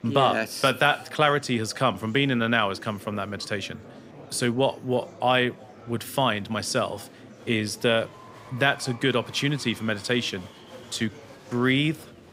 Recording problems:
murmuring crowd; faint; throughout; 20 dB below the speech

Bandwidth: 15.5 kHz